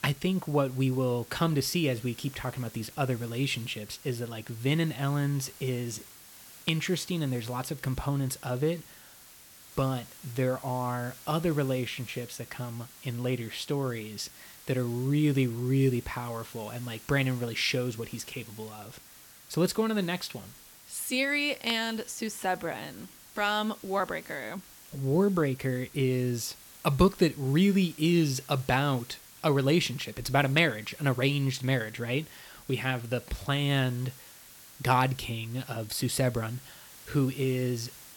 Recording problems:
hiss; noticeable; throughout; 20 dB below the speech

